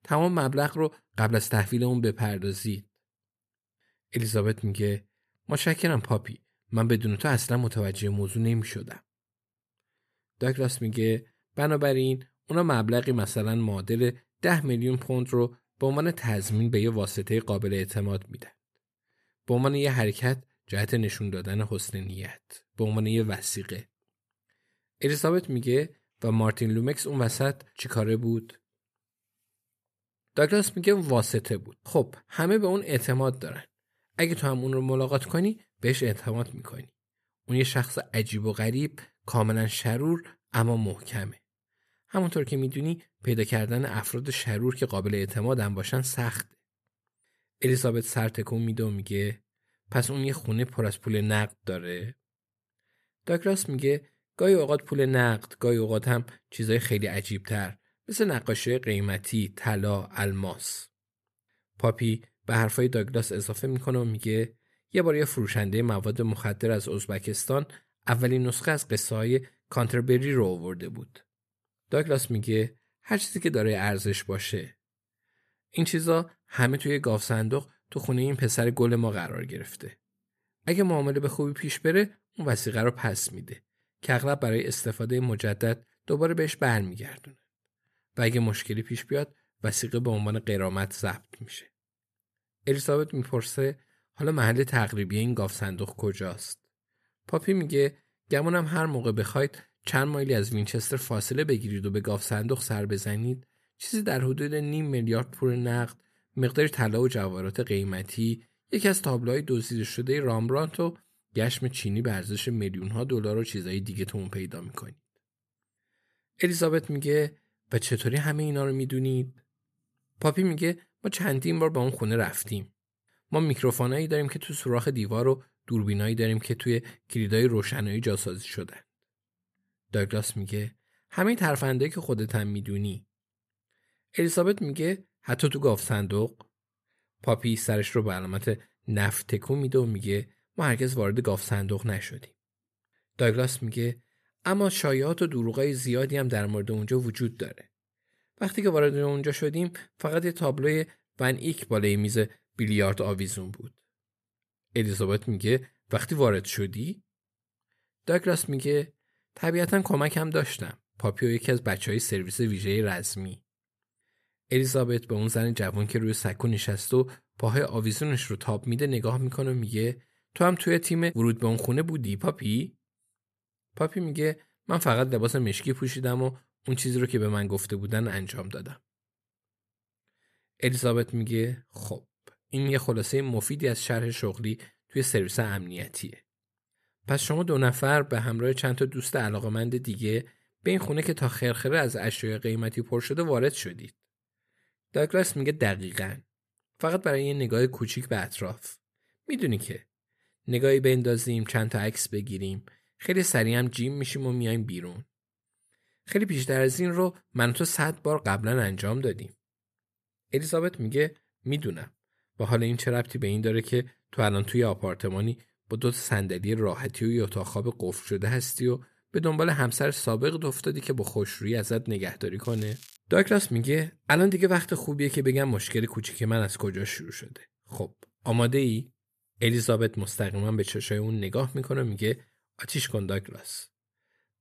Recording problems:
crackling; faint; at 3:42; 20 dB below the speech

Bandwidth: 14.5 kHz